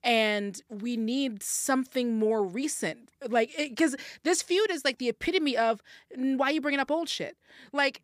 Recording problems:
none

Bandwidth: 15 kHz